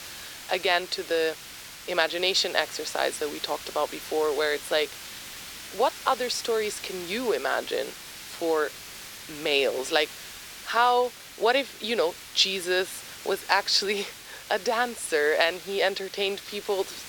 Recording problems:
thin; very; fading below 400 Hz
hiss; noticeable; throughout; 15 dB below the speech
high-pitched whine; faint; from 7 s on; 2.5 kHz, 30 dB below the speech

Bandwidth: 18.5 kHz